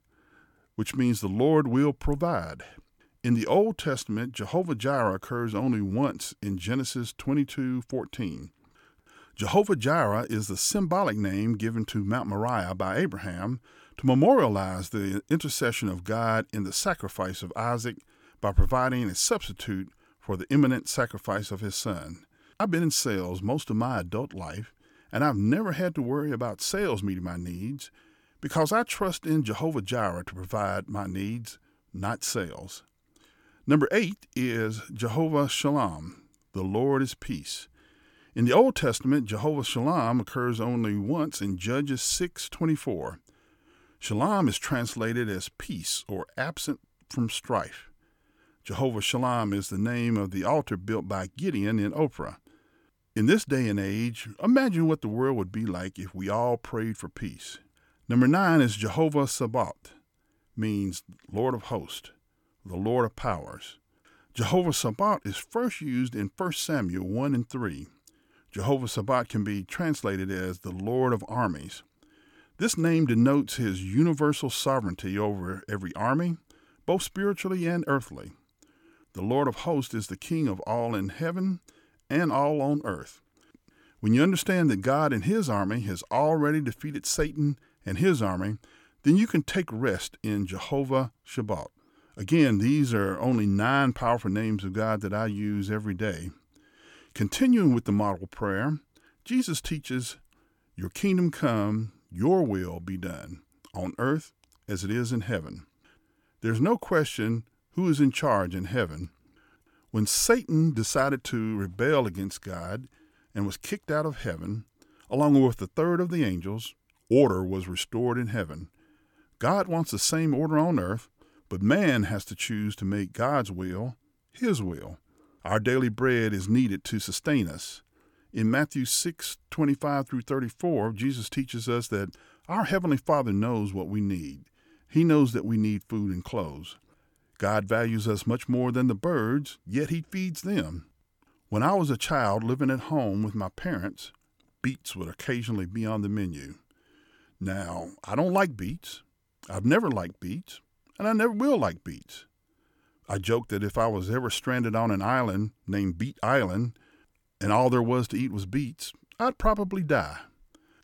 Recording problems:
none

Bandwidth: 17.5 kHz